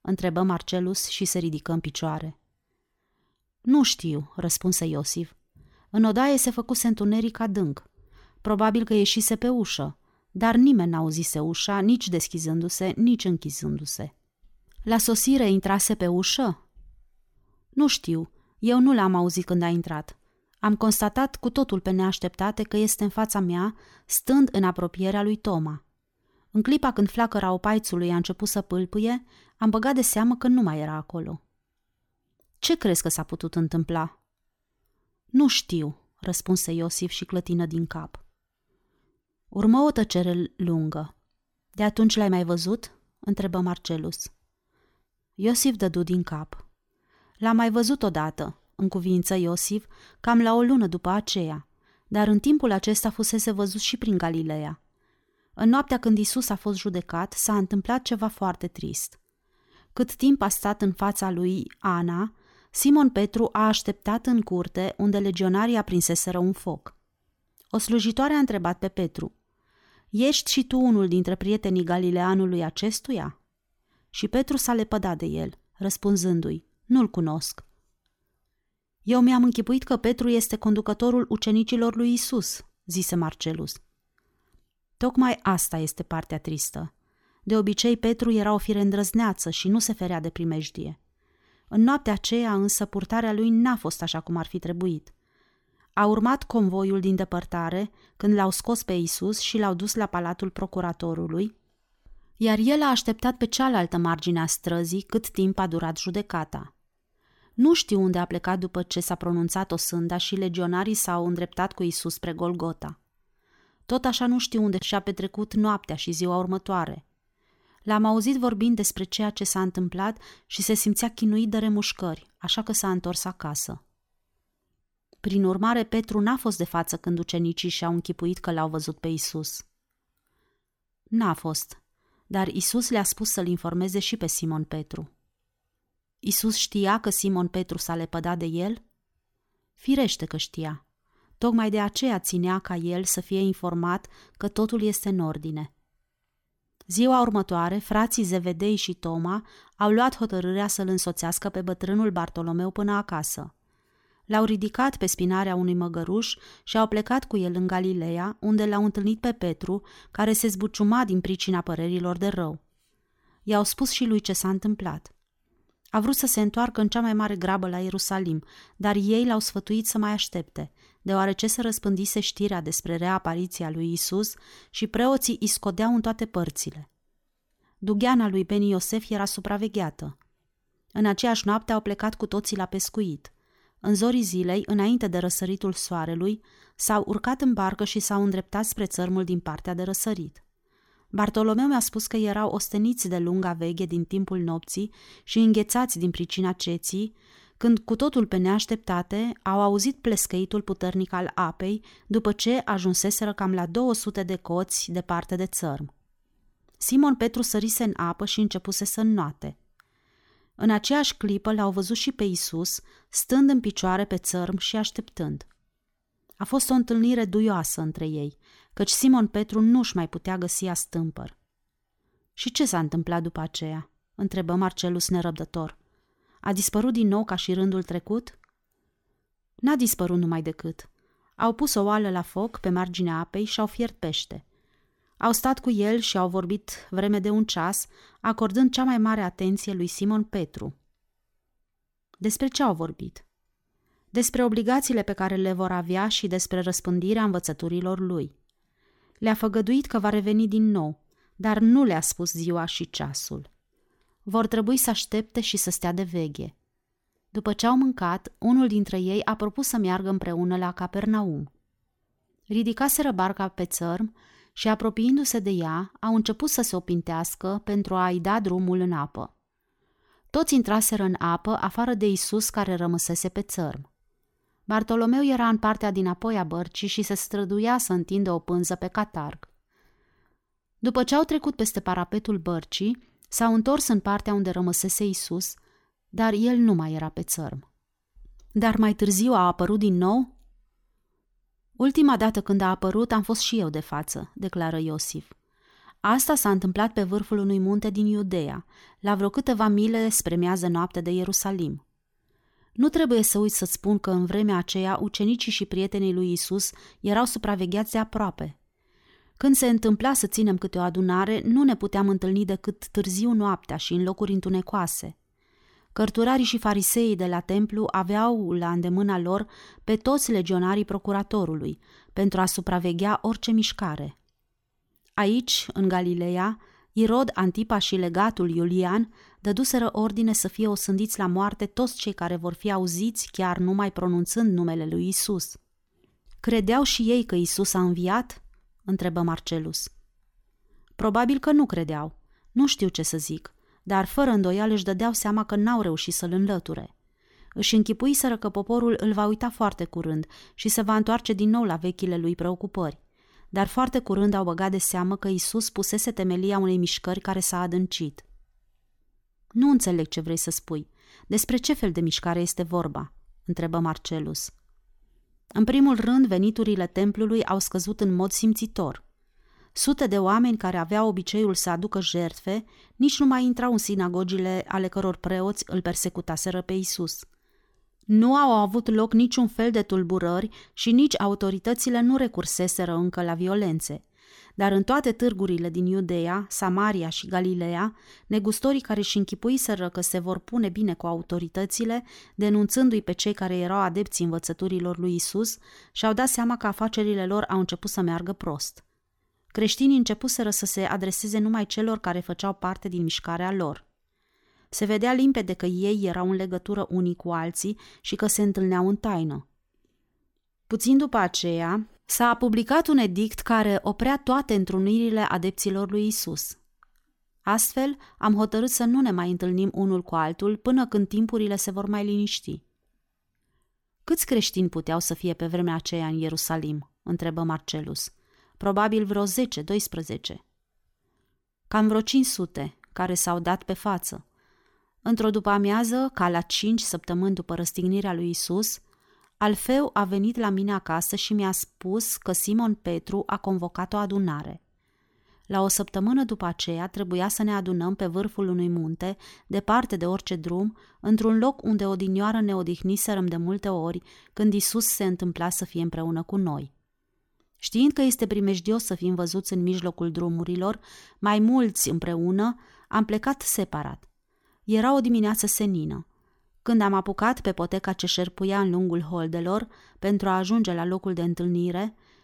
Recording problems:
none

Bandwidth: 18 kHz